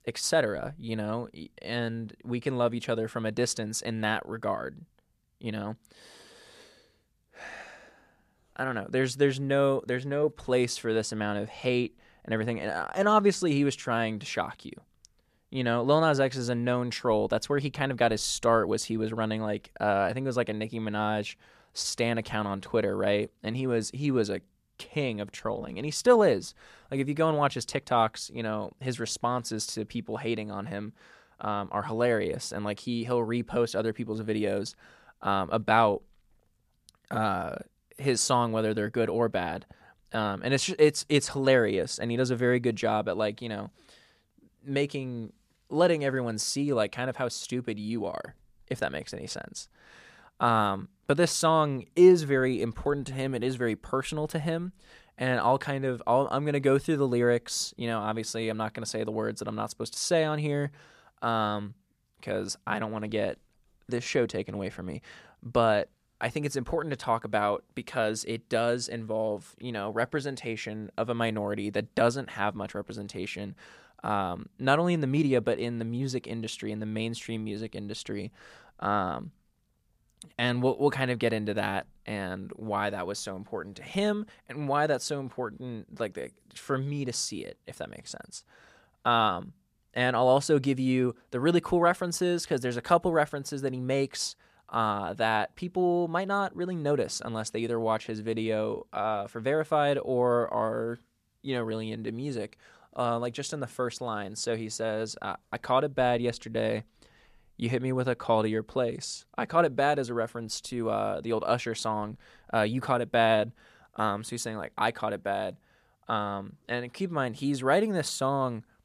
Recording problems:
none

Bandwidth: 14.5 kHz